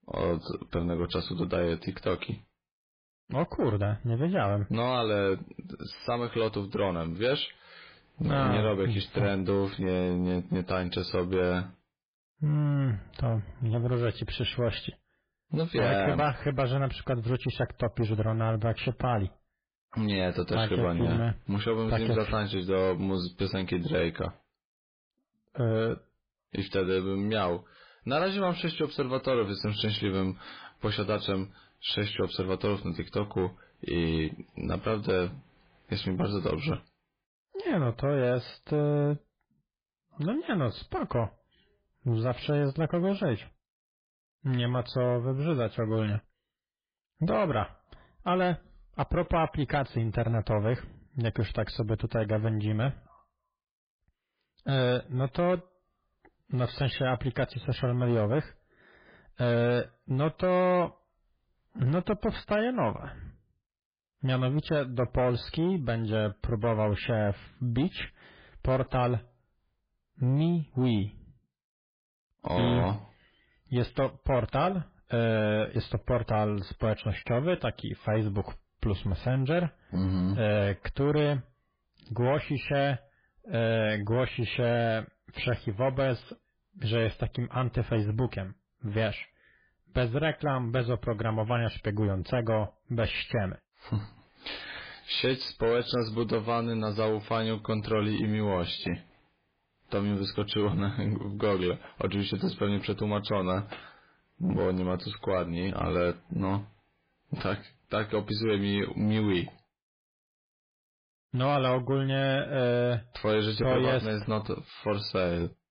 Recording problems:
garbled, watery; badly; nothing above 4 kHz
distortion; slight; 10 dB below the speech

